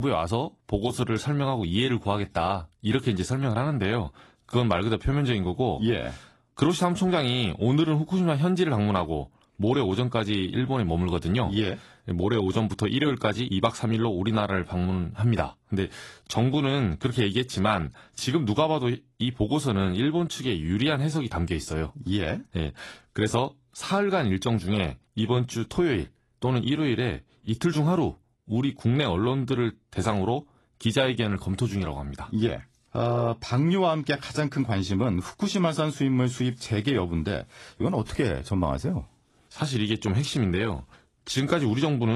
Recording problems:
garbled, watery; slightly; nothing above 11.5 kHz
abrupt cut into speech; at the start and the end

